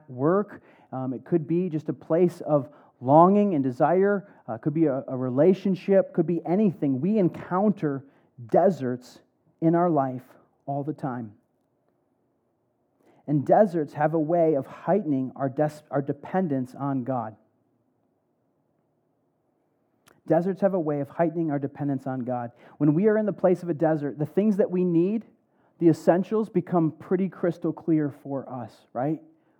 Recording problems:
muffled; very; fading above 1.5 kHz

